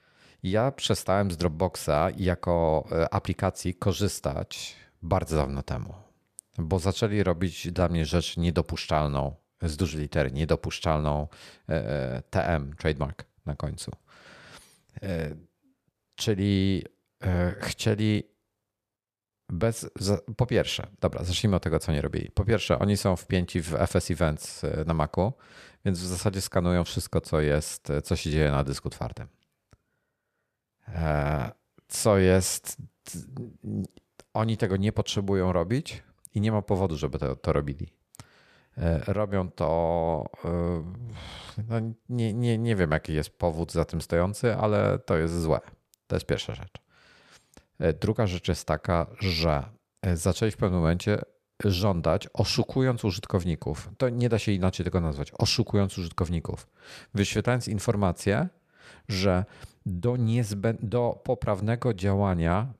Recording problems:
none

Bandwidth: 14.5 kHz